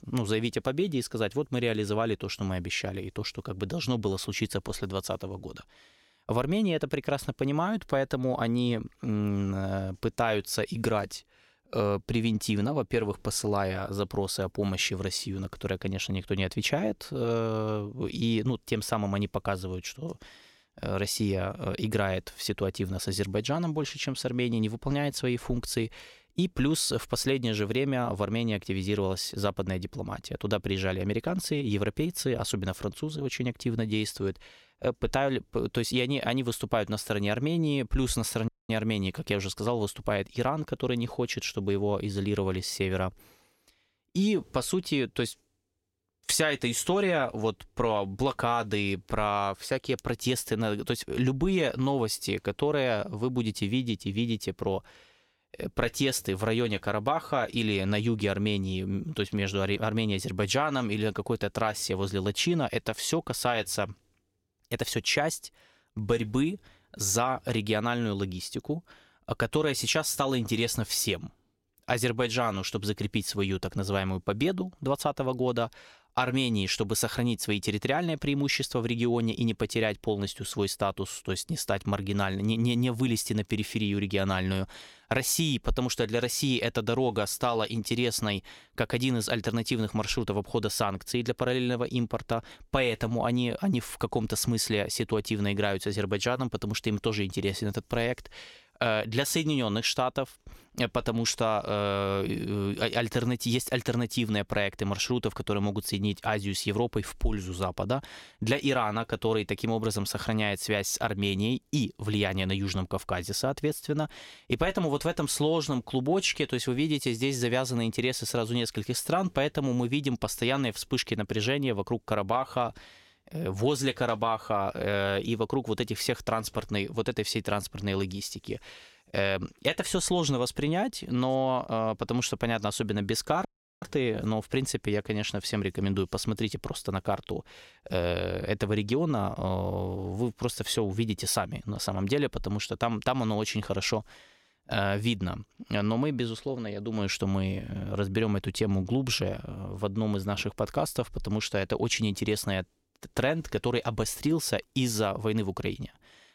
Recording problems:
audio cutting out; at 38 s and at 2:13

